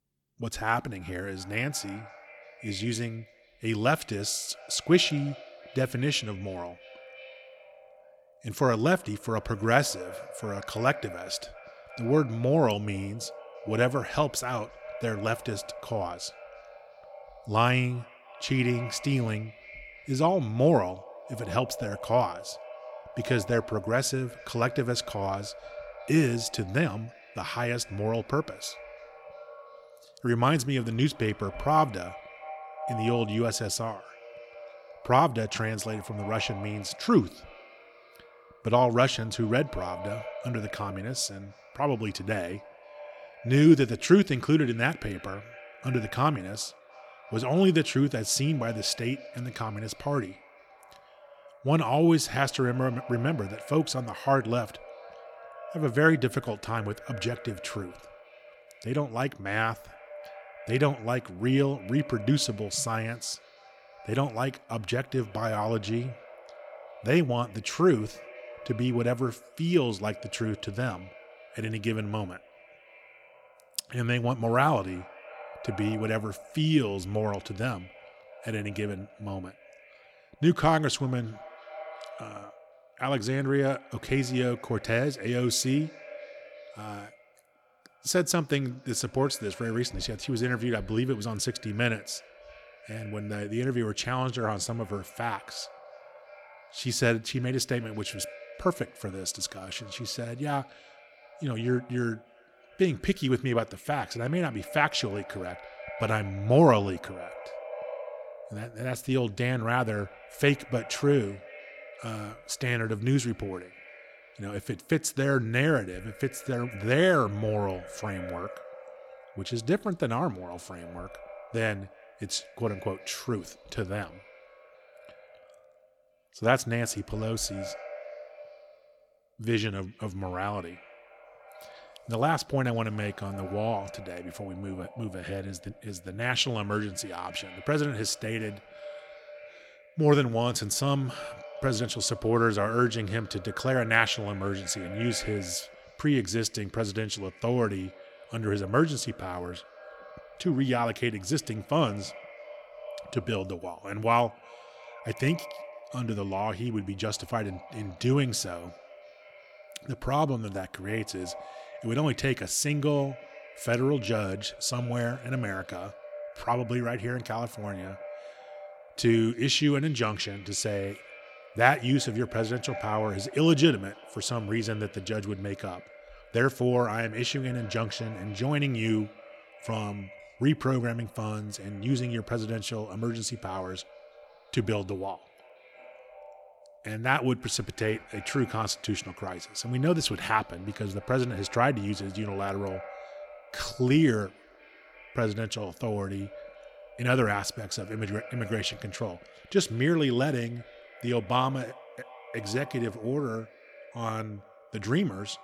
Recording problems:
echo of what is said; noticeable; throughout; 340 ms later, 20 dB below the speech

